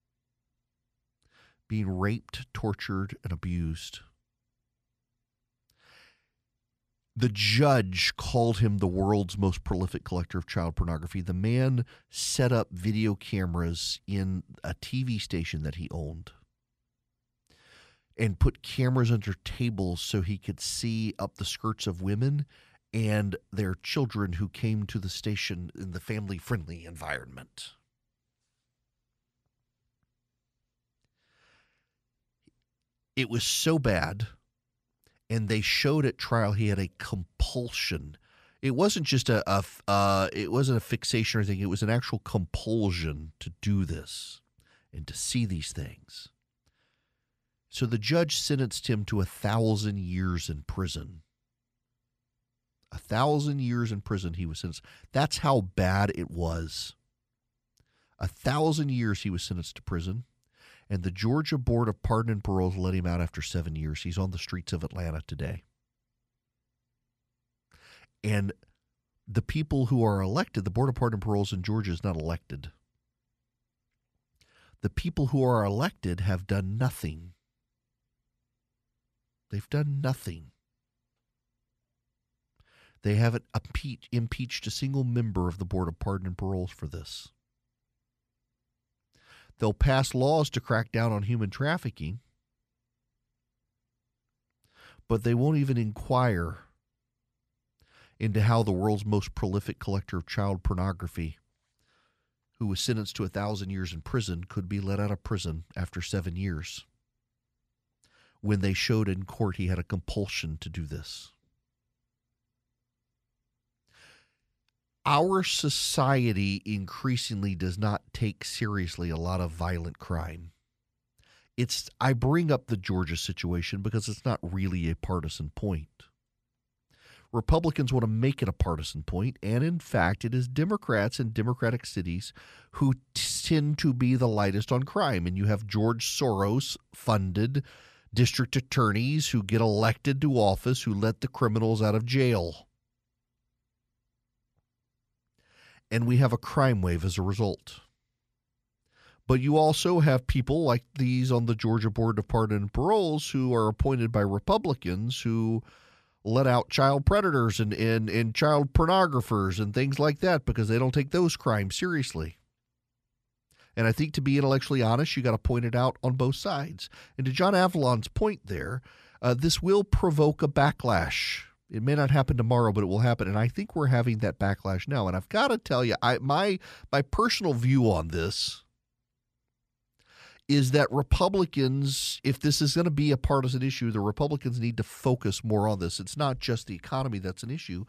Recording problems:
none

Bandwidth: 14.5 kHz